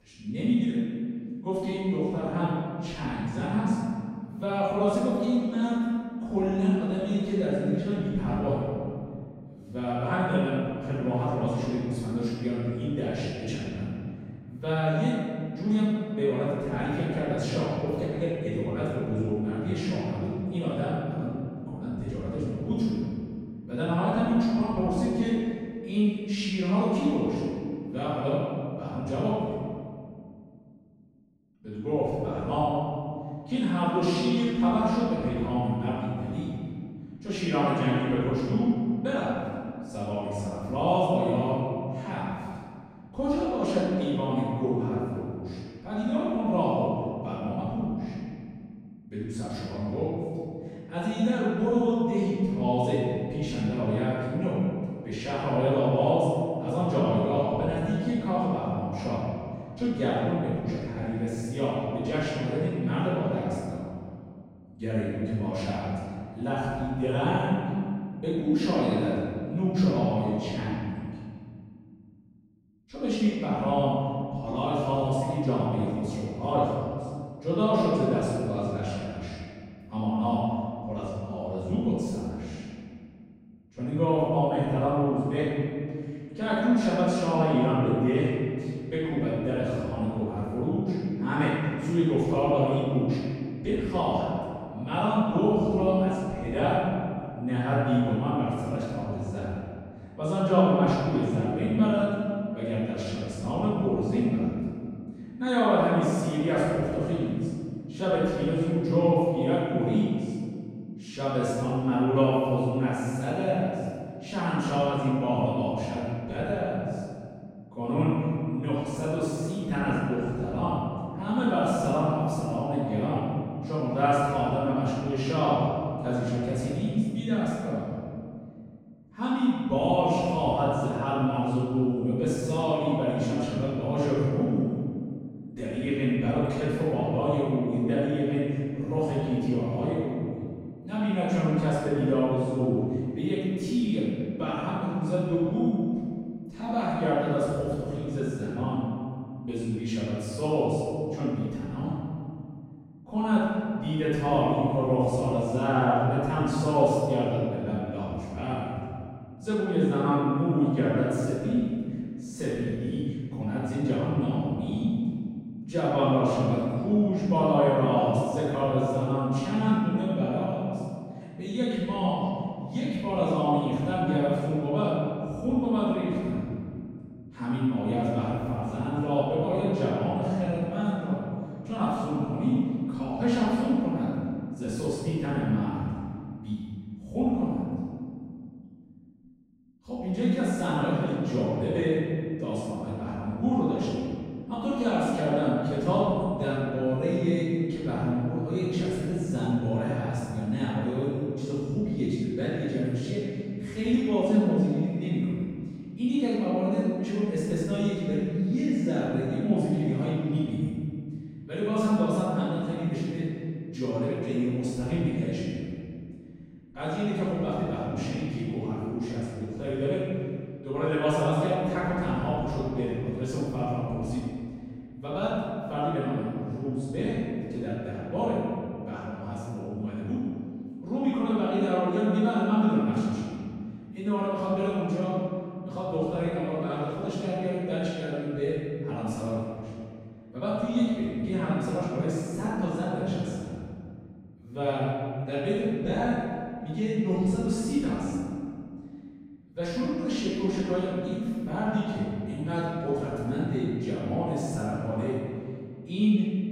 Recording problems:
room echo; strong; dies away in 2.2 s
off-mic speech; far

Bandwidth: 16 kHz